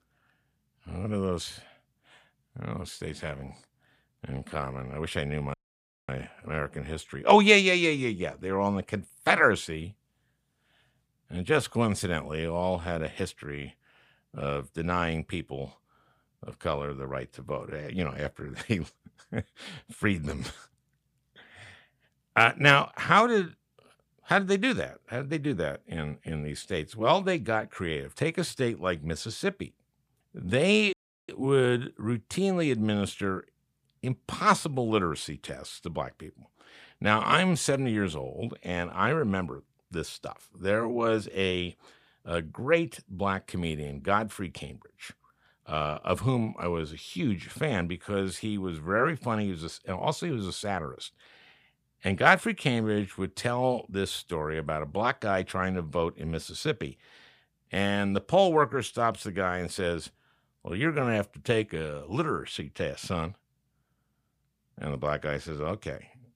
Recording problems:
audio cutting out; at 5.5 s for 0.5 s and at 31 s

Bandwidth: 15 kHz